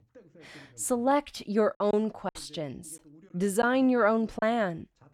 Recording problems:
voice in the background; faint; throughout; 30 dB below the speech
choppy; very; at 2 s and from 2.5 to 4.5 s; 5% of the speech affected

